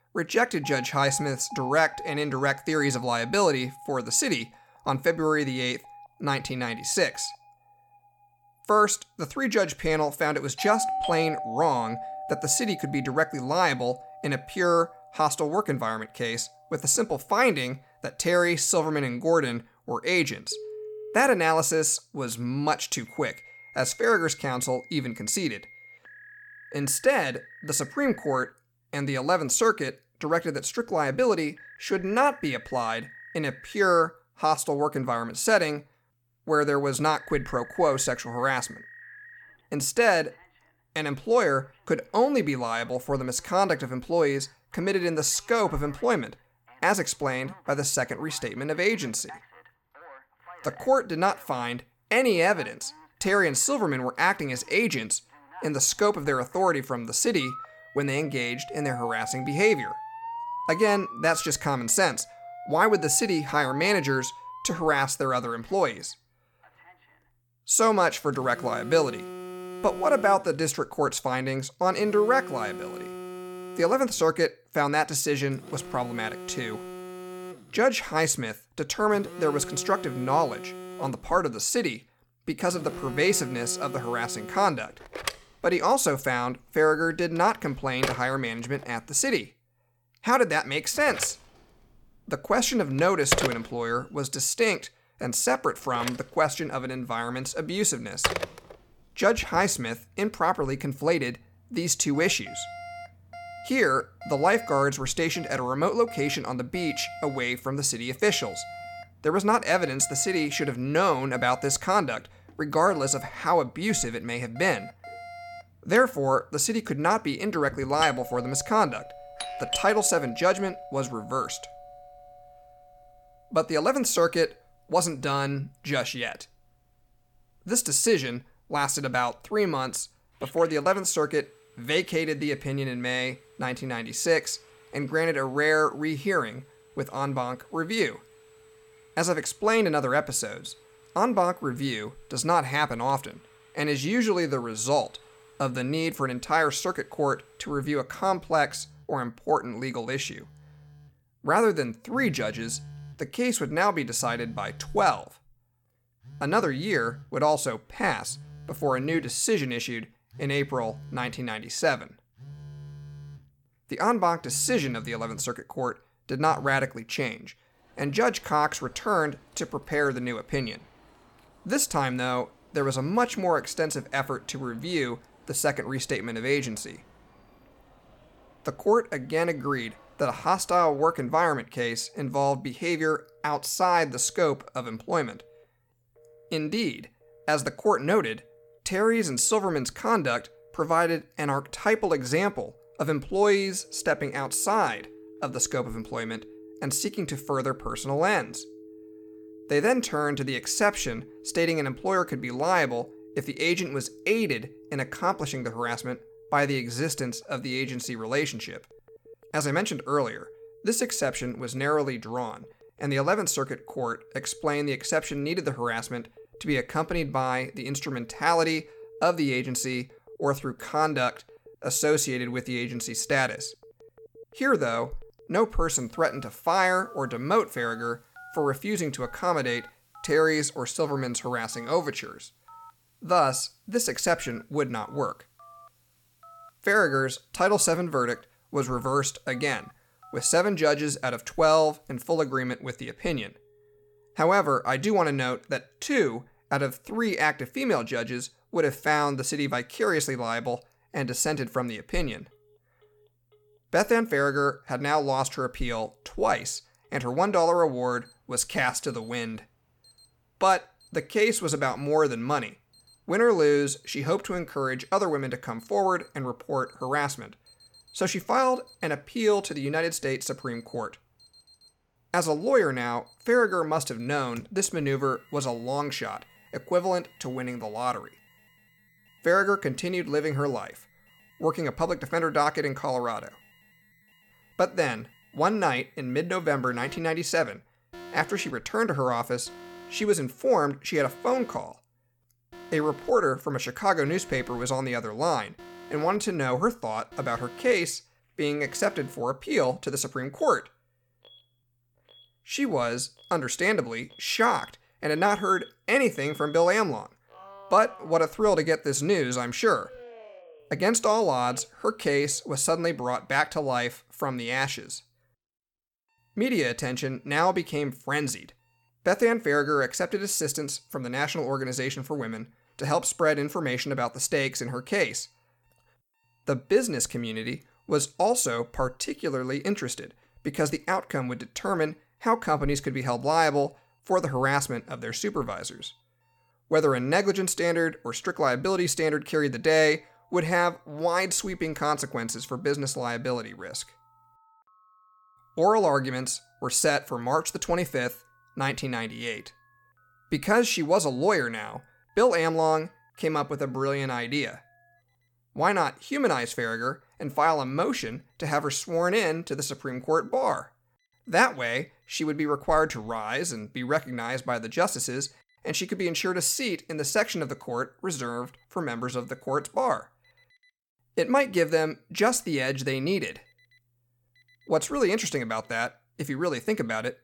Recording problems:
alarms or sirens; noticeable; throughout; 15 dB below the speech

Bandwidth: 18 kHz